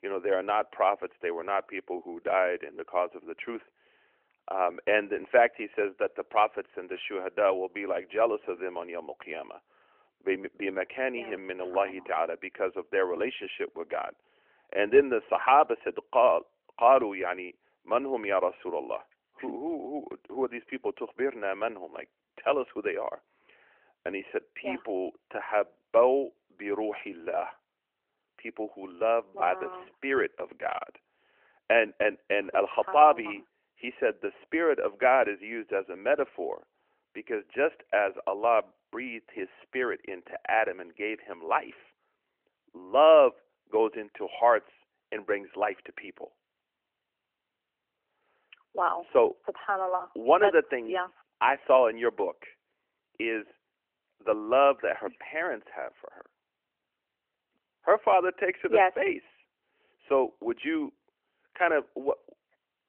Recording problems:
thin; very; fading below 450 Hz
phone-call audio; nothing above 3 kHz

